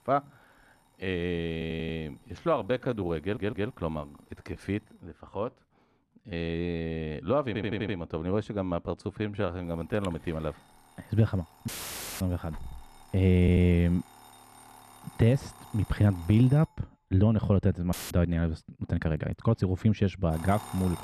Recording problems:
muffled; slightly; fading above 3 kHz
alarms or sirens; faint; throughout; 20 dB below the speech
audio stuttering; 4 times, first at 1.5 s
uneven, jittery; strongly; from 2 to 20 s
audio cutting out; filled with static; at 12 s for 0.5 s and at 18 s

